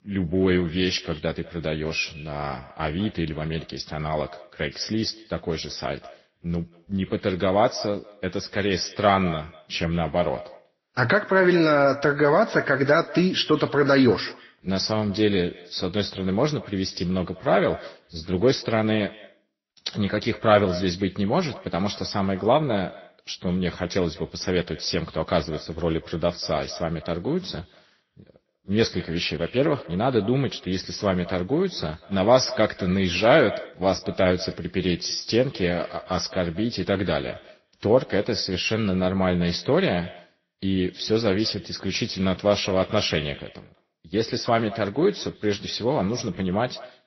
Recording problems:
echo of what is said; faint; throughout; 190 ms later, 20 dB below the speech
garbled, watery; slightly; nothing above 6 kHz
high-pitched whine; very faint; throughout; 2 kHz, 70 dB below the speech

